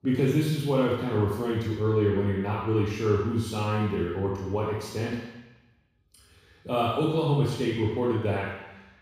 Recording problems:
room echo; strong; dies away in 1.1 s
off-mic speech; far

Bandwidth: 15.5 kHz